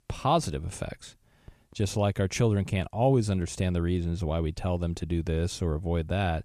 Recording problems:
none

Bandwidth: 14.5 kHz